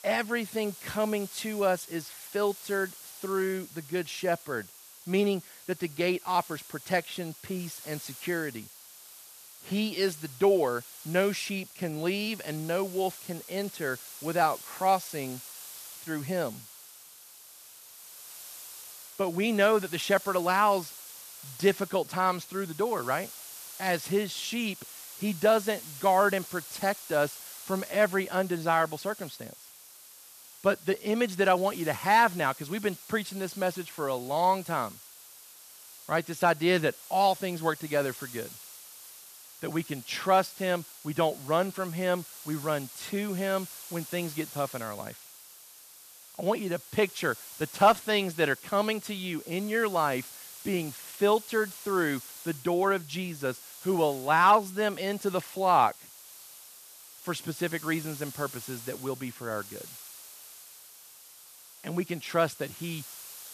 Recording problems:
hiss; noticeable; throughout; 15 dB below the speech

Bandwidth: 14.5 kHz